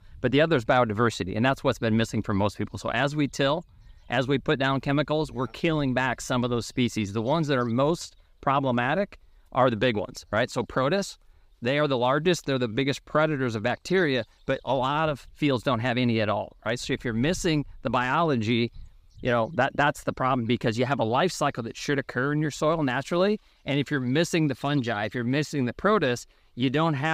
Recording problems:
abrupt cut into speech; at the end

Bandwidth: 15.5 kHz